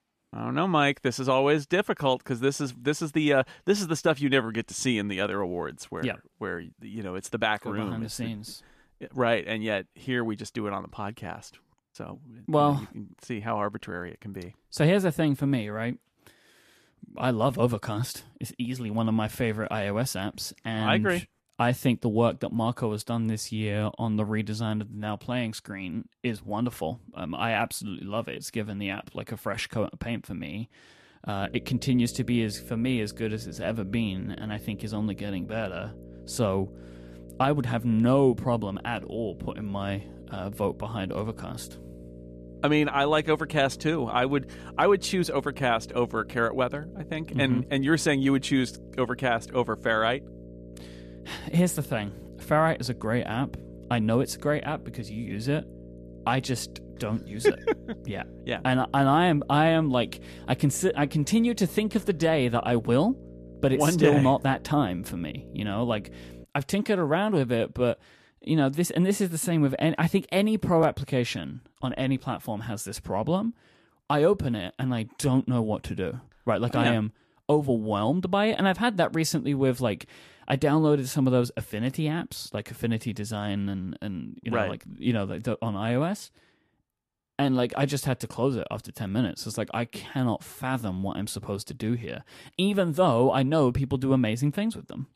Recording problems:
electrical hum; faint; from 31 s to 1:06; 60 Hz, 20 dB below the speech

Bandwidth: 14.5 kHz